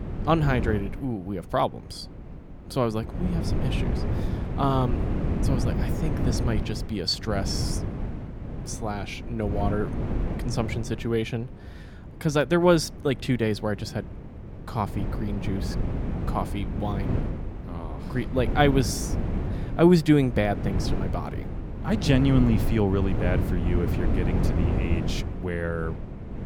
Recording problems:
wind noise on the microphone; heavy; 9 dB below the speech

